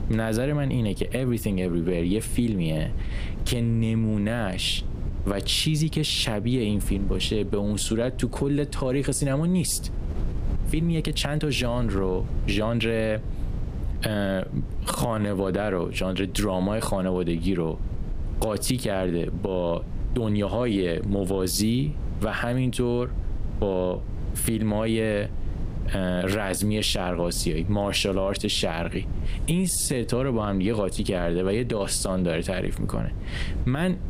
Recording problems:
squashed, flat; somewhat
wind noise on the microphone; occasional gusts; 20 dB below the speech
uneven, jittery; strongly; from 10 to 30 s

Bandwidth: 15 kHz